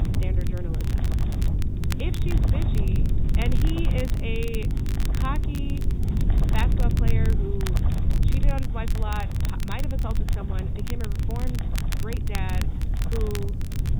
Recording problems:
high frequencies cut off; severe; nothing above 4 kHz
wind noise on the microphone; heavy; 4 dB below the speech
electrical hum; loud; until 7.5 s; 50 Hz, 8 dB below the speech
crackle, like an old record; loud; 7 dB below the speech
hiss; faint; throughout; 25 dB below the speech

